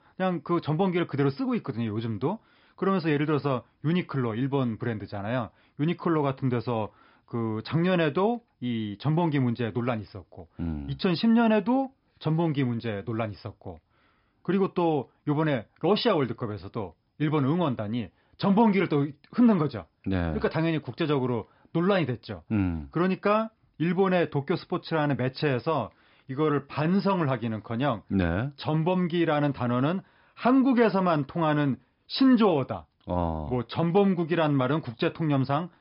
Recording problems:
high frequencies cut off; noticeable; nothing above 5.5 kHz

